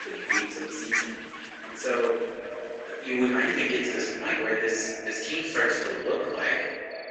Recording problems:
room echo; strong; dies away in 1.2 s
off-mic speech; far
garbled, watery; badly; nothing above 7 kHz
echo of what is said; noticeable; throughout; 220 ms later, 15 dB below the speech
thin; somewhat; fading below 300 Hz
animal sounds; loud; throughout; 5 dB below the speech

